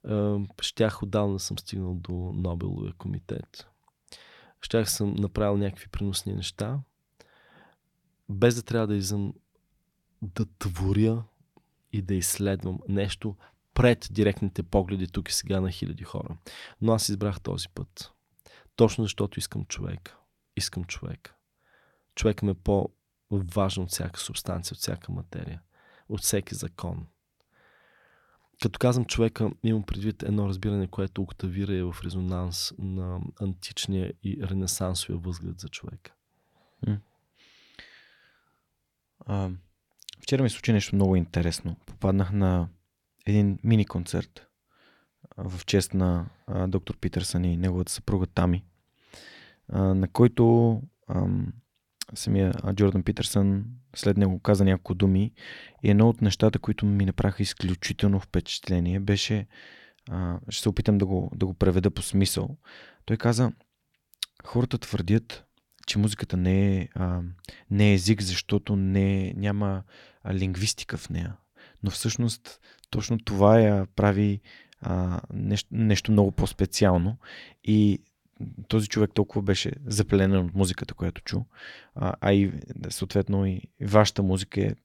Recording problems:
none

